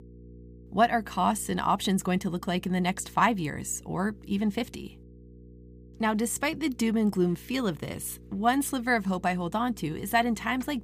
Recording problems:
electrical hum; faint; throughout; 60 Hz, 30 dB below the speech

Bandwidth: 15 kHz